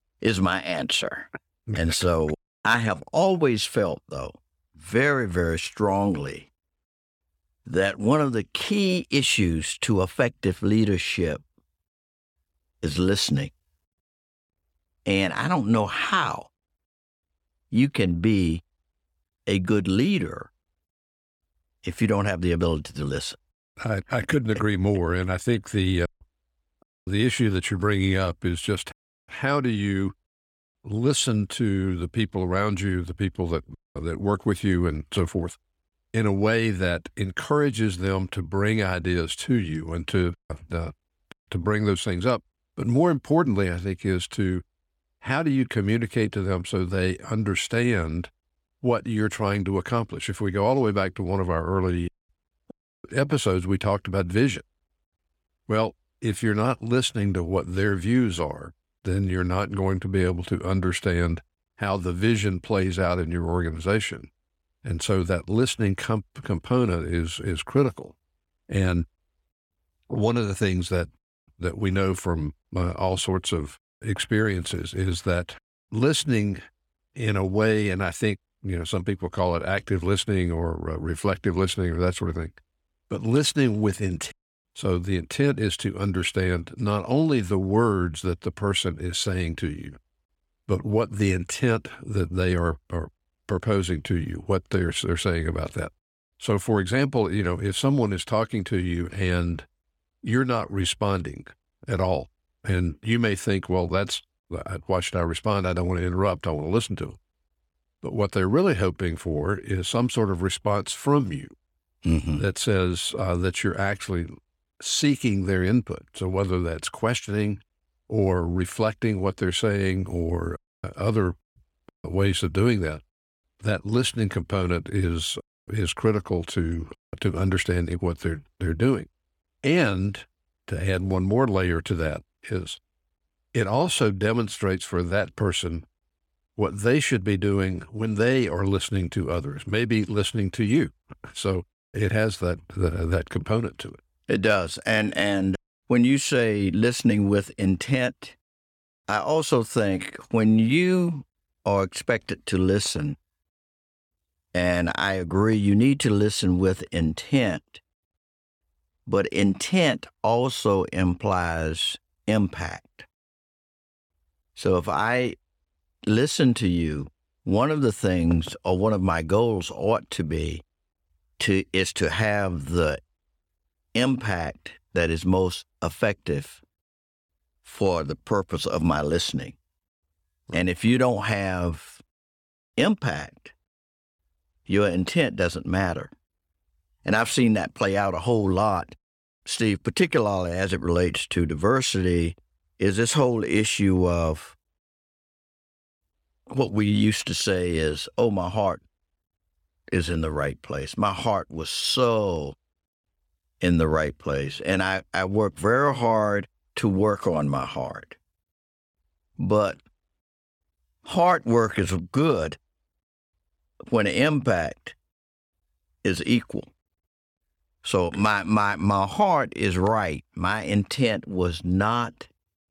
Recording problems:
none

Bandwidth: 17 kHz